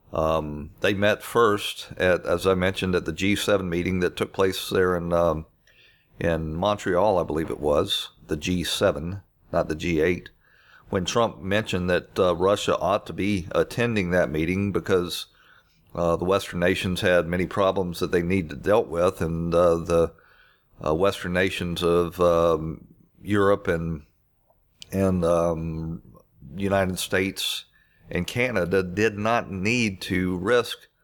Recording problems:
none

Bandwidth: 18.5 kHz